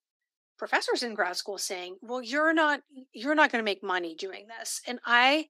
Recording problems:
thin; somewhat; fading below 250 Hz

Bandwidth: 15.5 kHz